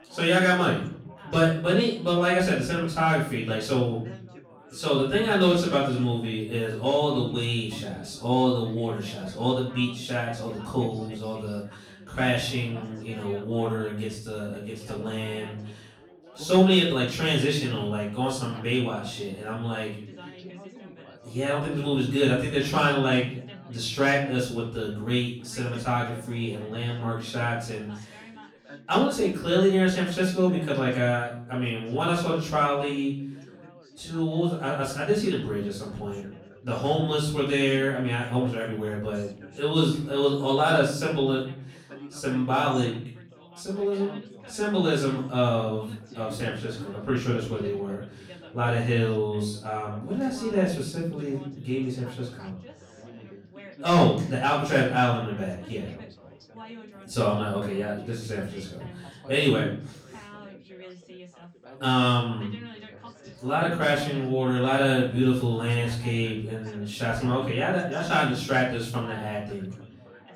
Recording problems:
off-mic speech; far
room echo; noticeable; dies away in 0.5 s
background chatter; faint; throughout; 4 voices, 20 dB below the speech

